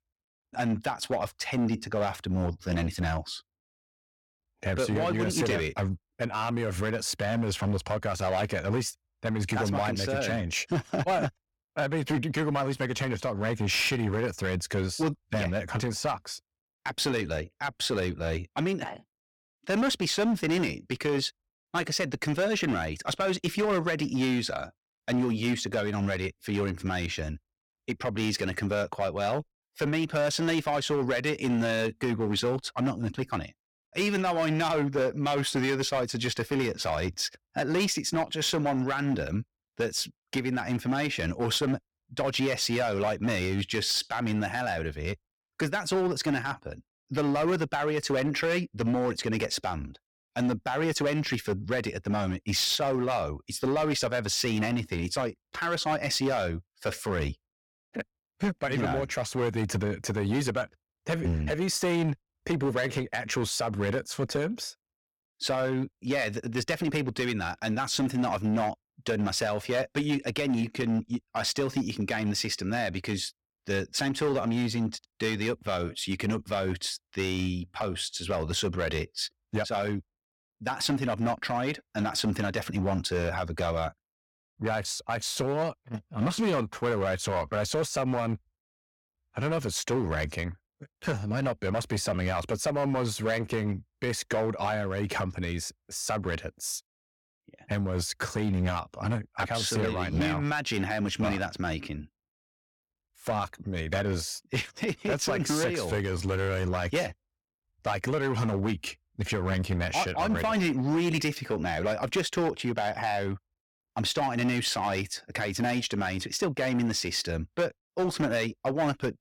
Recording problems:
distortion; slight; 8% of the sound clipped

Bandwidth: 17 kHz